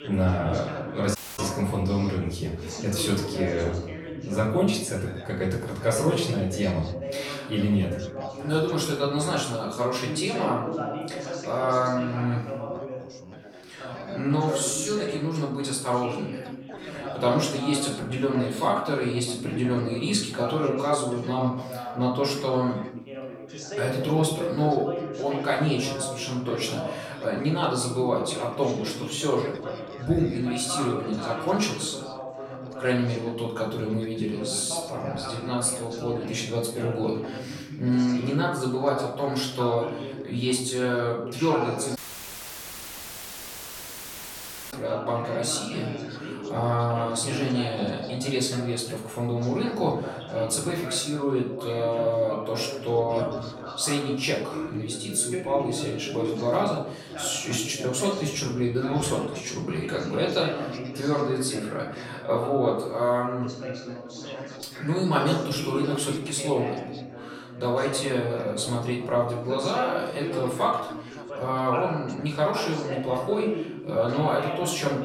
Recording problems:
off-mic speech; far
room echo; noticeable; dies away in 0.6 s
background chatter; loud; throughout; 3 voices, 9 dB below the speech
audio cutting out; at 1 s and at 42 s for 3 s

